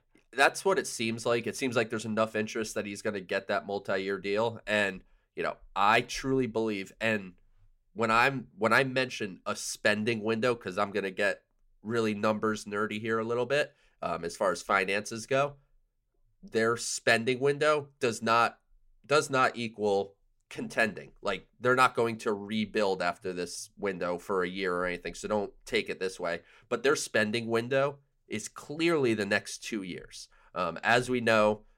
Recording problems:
none

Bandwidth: 16 kHz